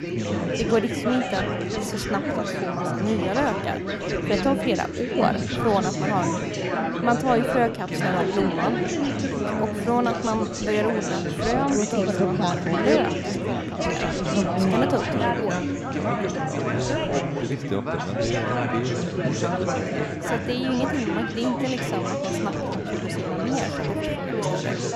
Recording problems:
chatter from many people; very loud; throughout; 2 dB above the speech

